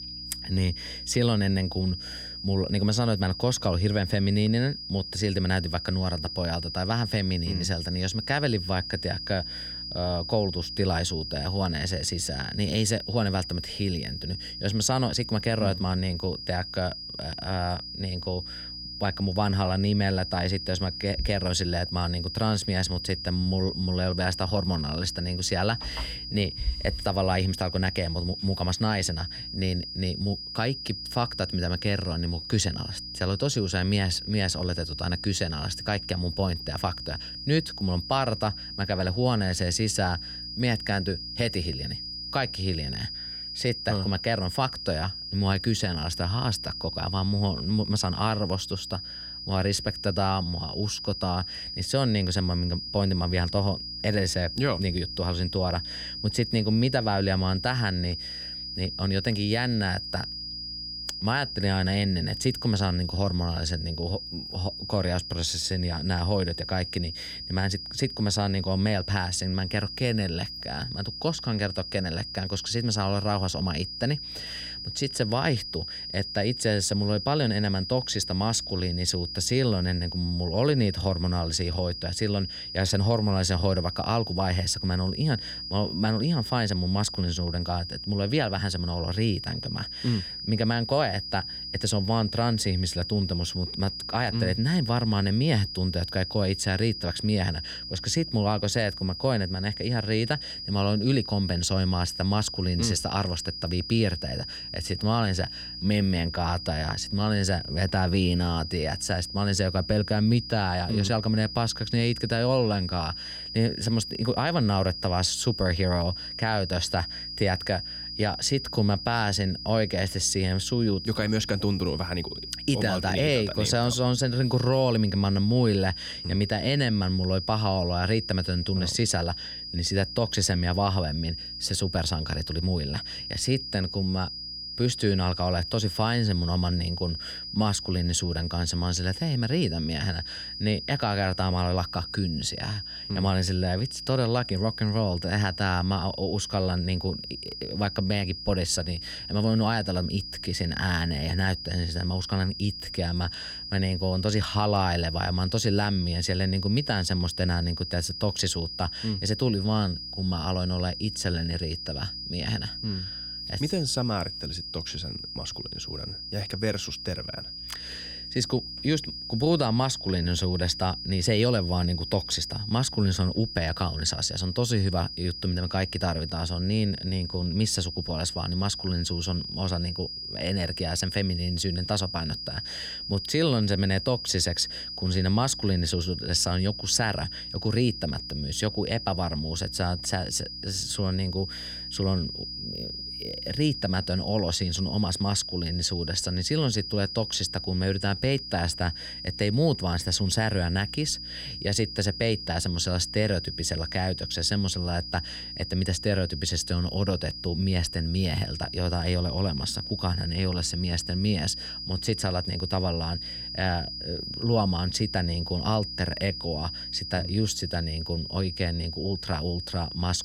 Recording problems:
high-pitched whine; loud; throughout; 5 kHz, 7 dB below the speech
electrical hum; faint; throughout; 60 Hz, 30 dB below the speech

